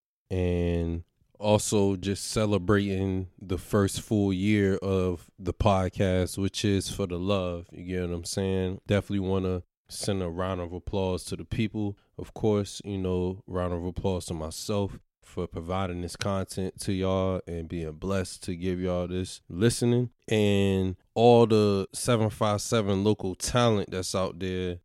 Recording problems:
none

